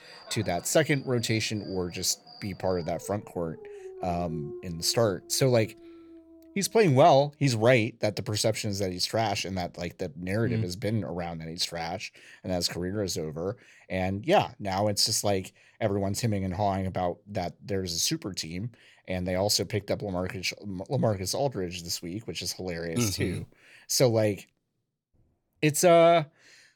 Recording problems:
animal sounds; noticeable; until 7.5 s; 20 dB below the speech

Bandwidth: 17.5 kHz